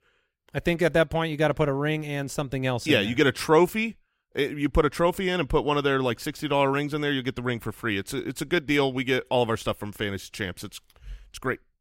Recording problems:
none

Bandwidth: 16 kHz